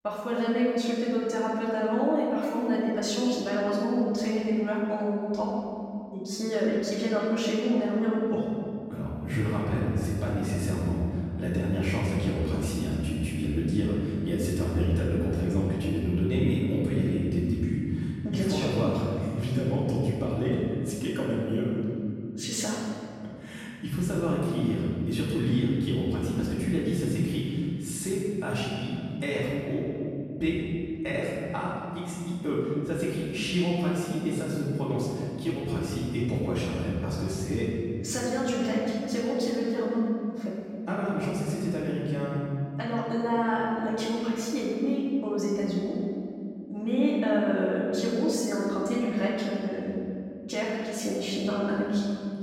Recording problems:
room echo; strong; dies away in 2.4 s
off-mic speech; far

